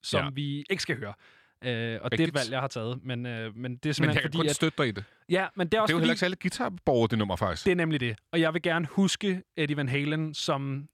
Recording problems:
none

